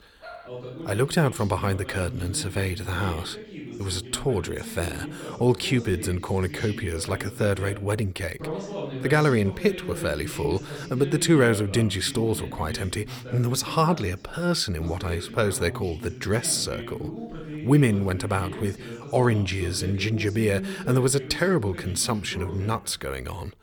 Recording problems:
voice in the background; noticeable; throughout; 10 dB below the speech
dog barking; faint; at the start; peak 20 dB below the speech

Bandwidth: 18 kHz